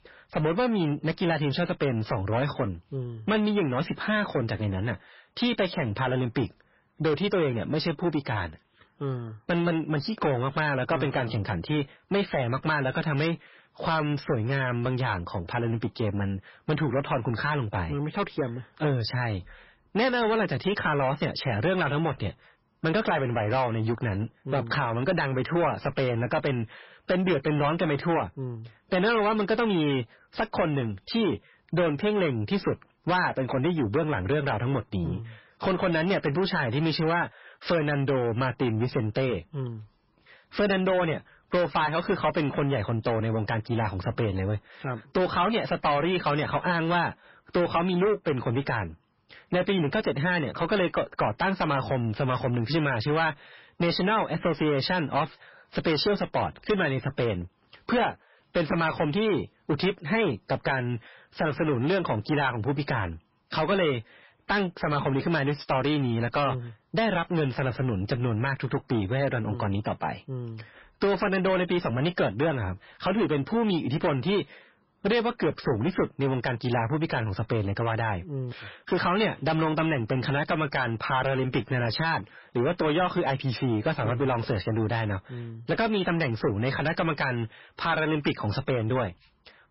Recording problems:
distortion; heavy; 7 dB below the speech
garbled, watery; badly; nothing above 5.5 kHz

